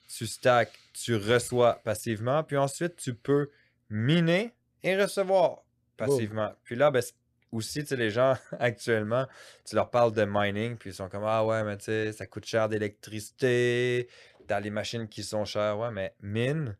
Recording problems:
none

